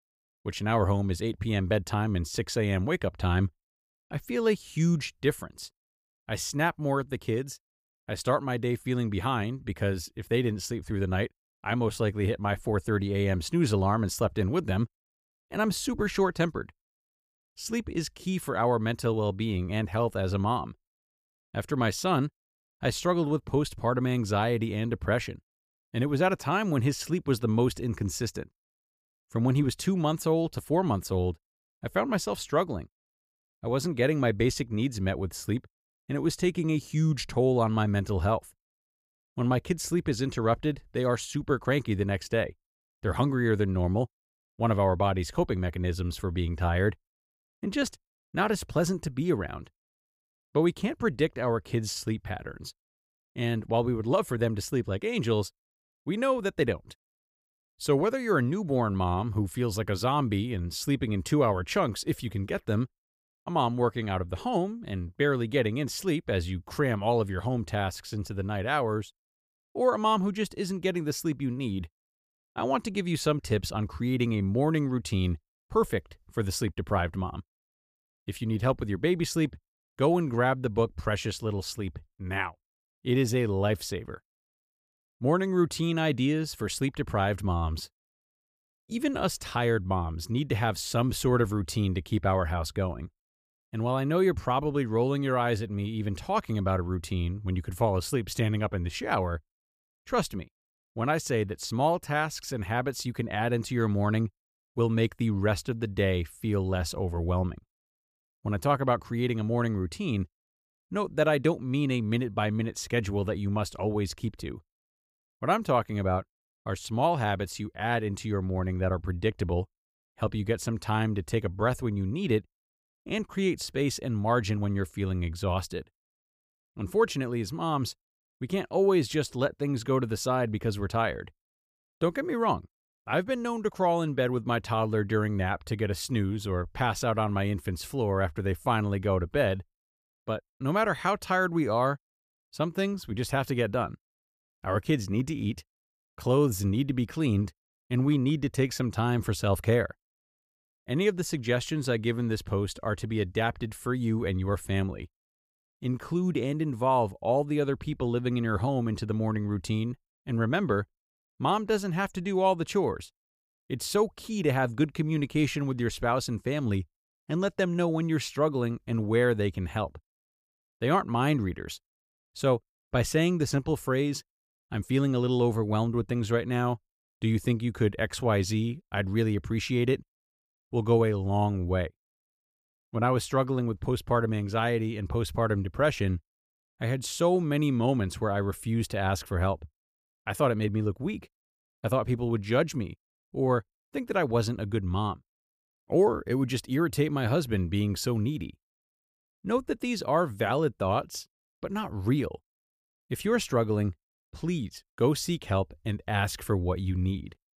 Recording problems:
none

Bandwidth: 15 kHz